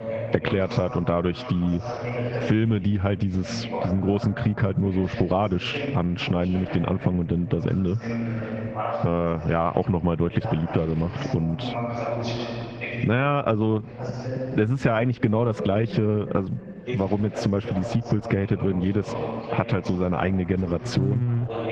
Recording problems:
garbled, watery; badly; nothing above 7 kHz
squashed, flat; heavily, background pumping
muffled; very slightly; fading above 3 kHz
voice in the background; loud; throughout; 9 dB below the speech

